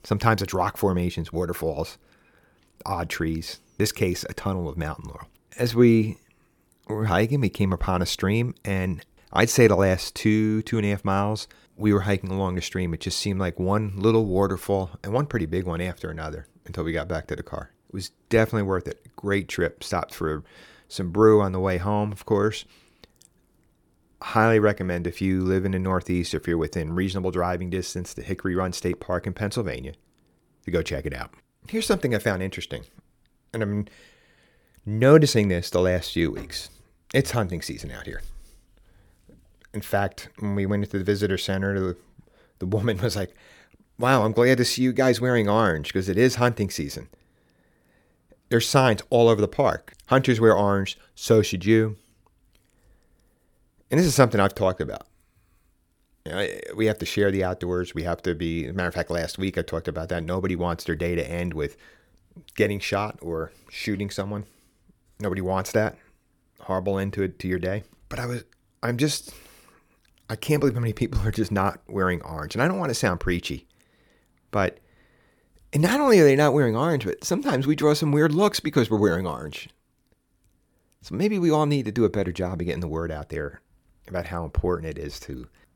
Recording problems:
none

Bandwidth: 18 kHz